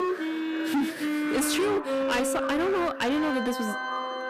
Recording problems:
distortion; heavy; 16% of the sound clipped
background music; loud; throughout; 3 dB below the speech
voice in the background; noticeable; throughout; 10 dB below the speech

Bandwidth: 14.5 kHz